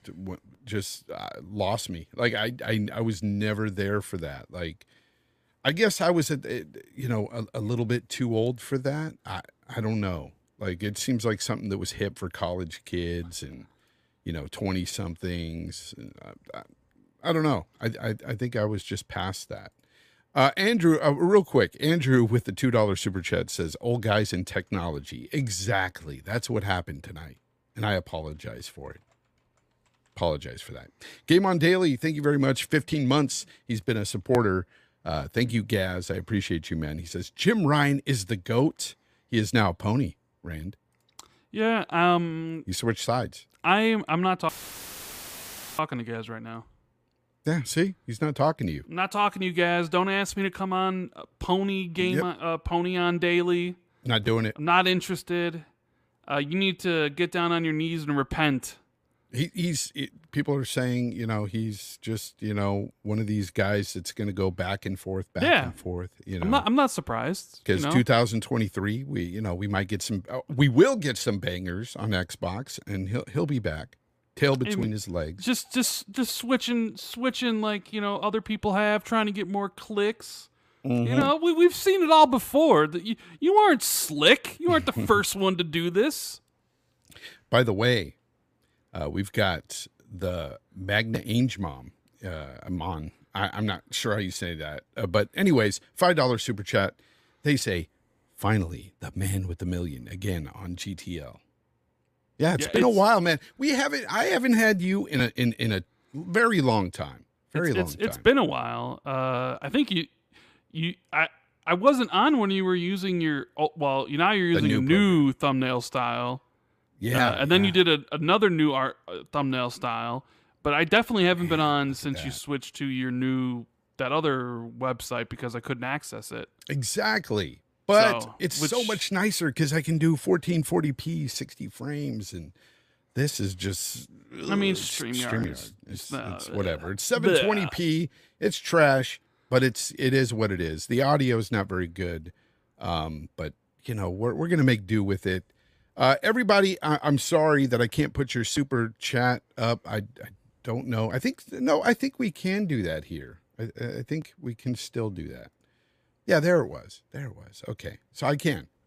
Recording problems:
audio cutting out; filled with static; at 44 s for 1.5 s

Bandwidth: 15 kHz